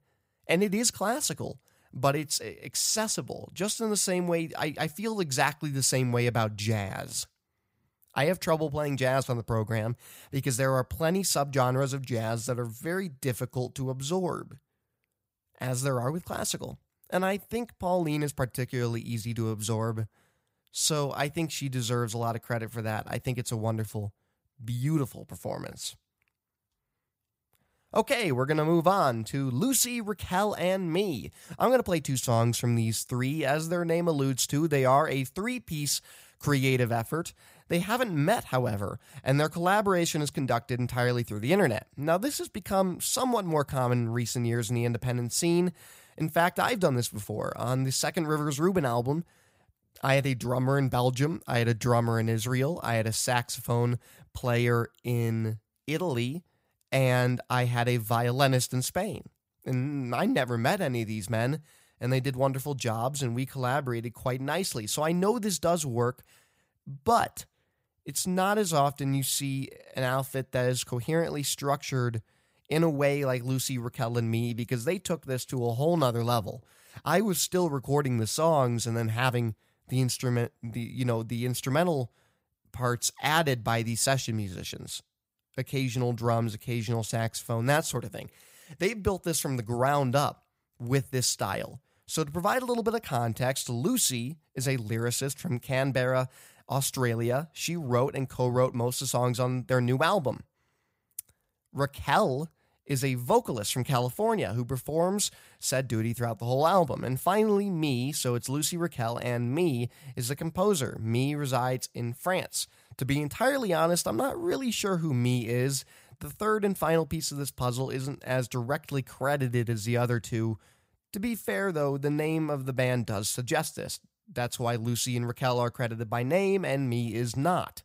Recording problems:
none

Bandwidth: 15.5 kHz